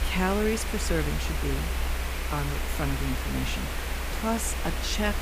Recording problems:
hiss; loud; throughout; 3 dB below the speech
low rumble; faint; throughout; 25 dB below the speech

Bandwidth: 15 kHz